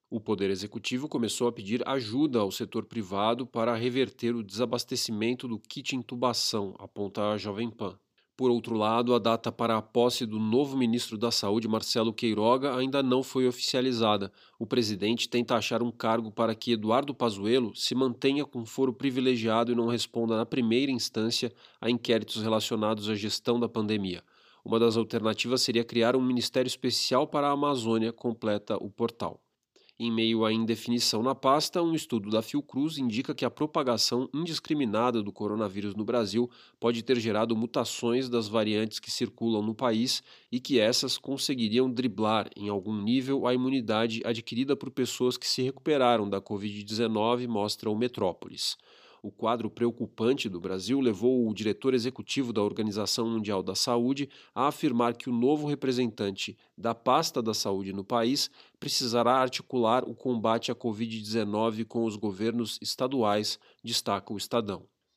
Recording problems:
none

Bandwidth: 15 kHz